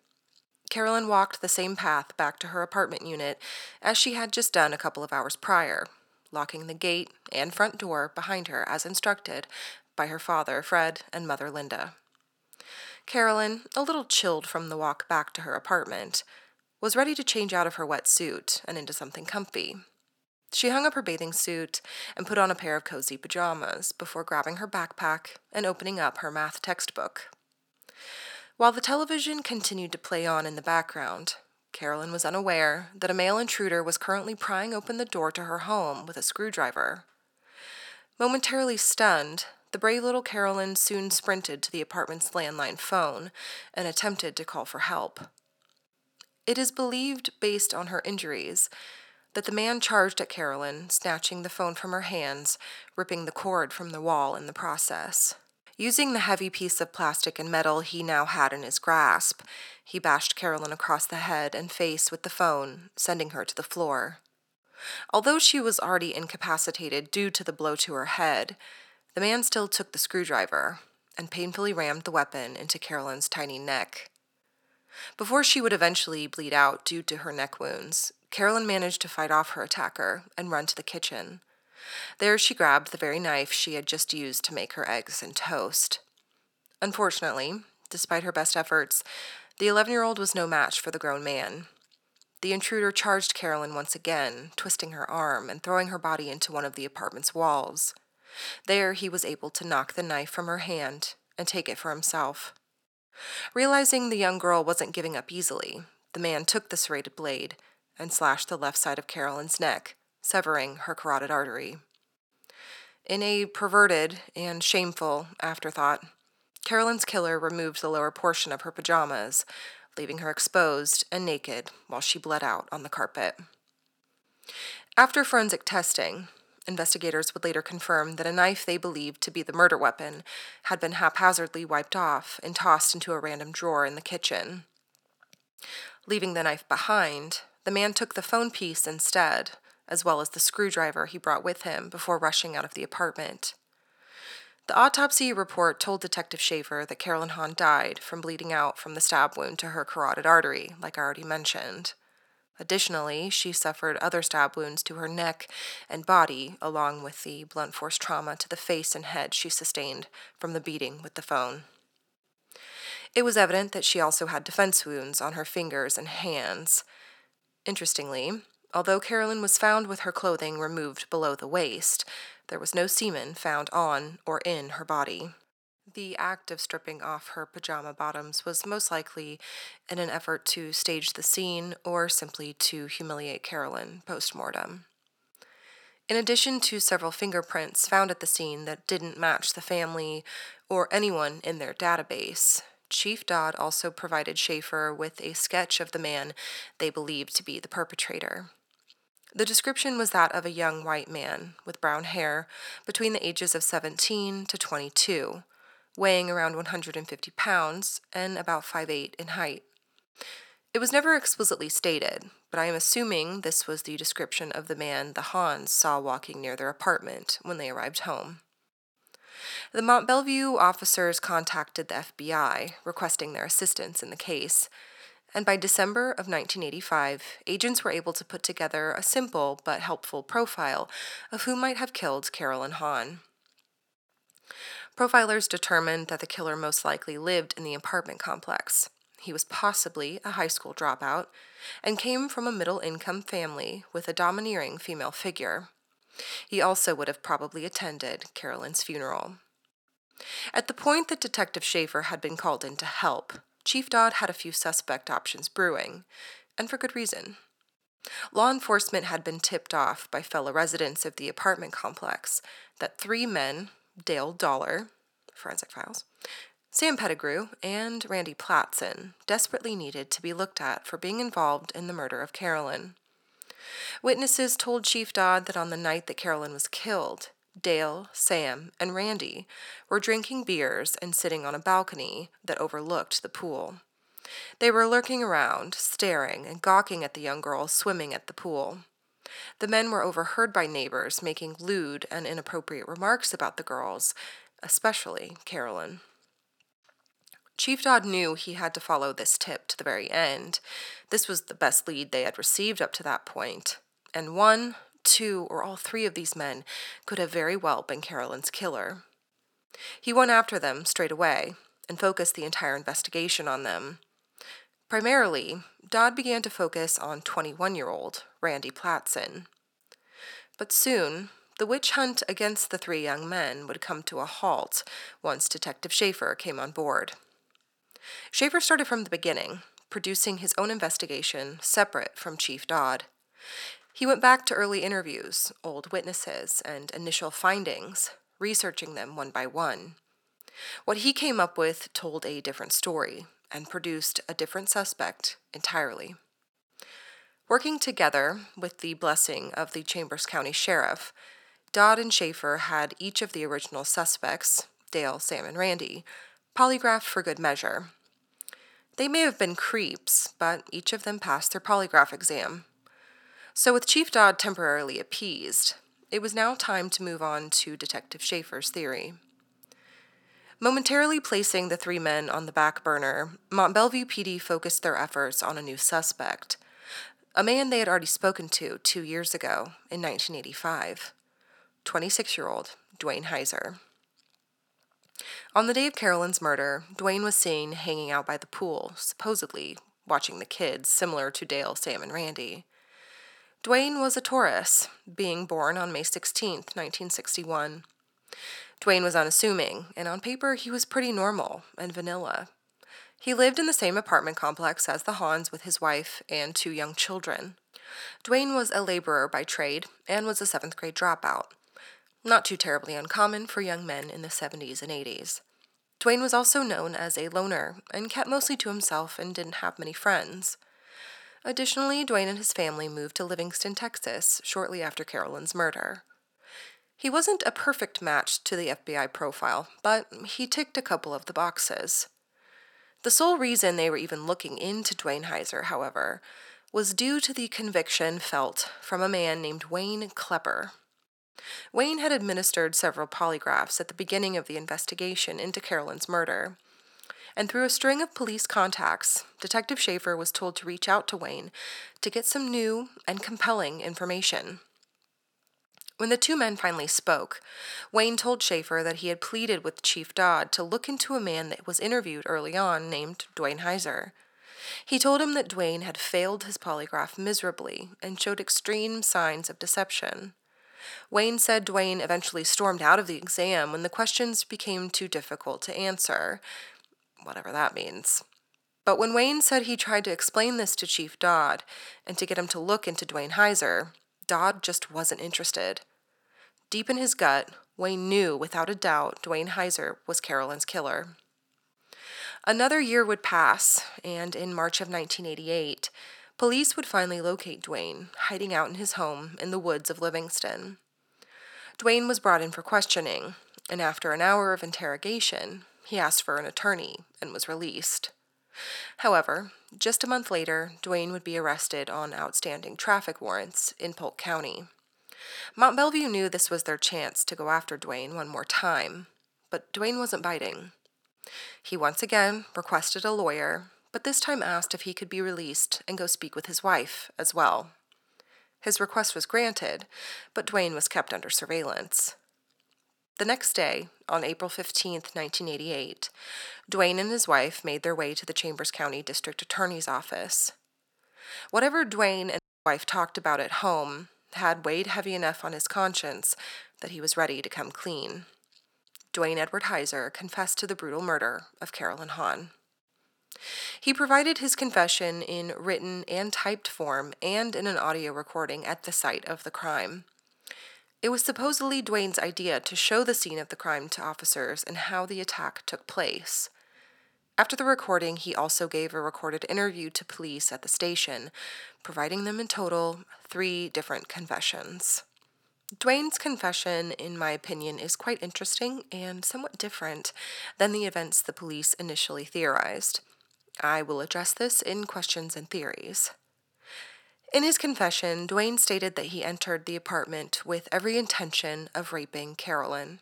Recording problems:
thin; very; fading below 500 Hz
audio cutting out; at 9:02

